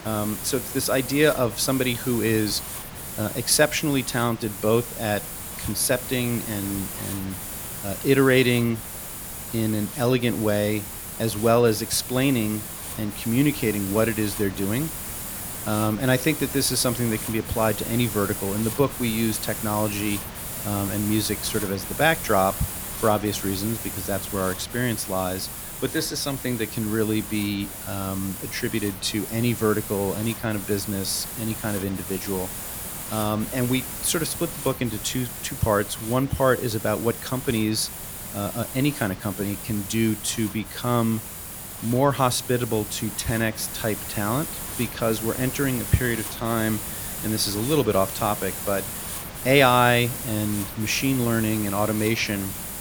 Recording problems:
hiss; loud; throughout; 7 dB below the speech

